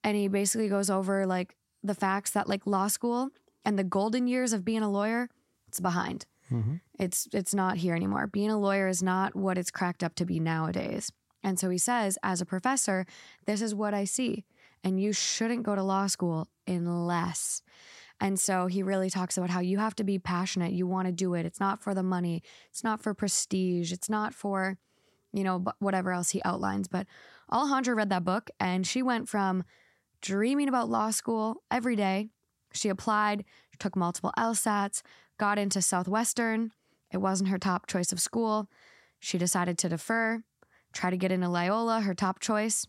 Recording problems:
none

